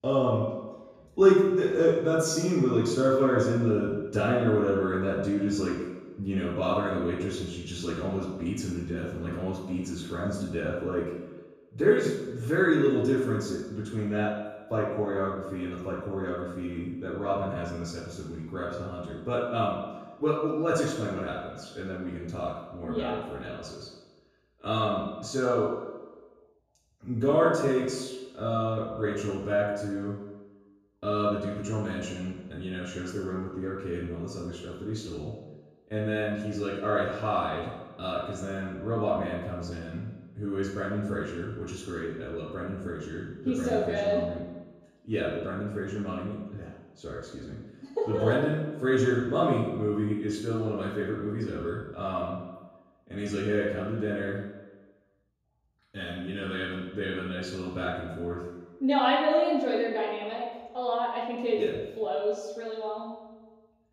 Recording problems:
room echo; strong; dies away in 1.2 s
off-mic speech; far

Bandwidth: 15 kHz